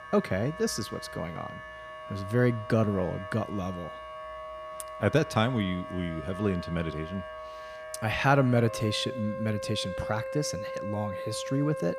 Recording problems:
background music; loud; throughout; 10 dB below the speech

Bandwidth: 14.5 kHz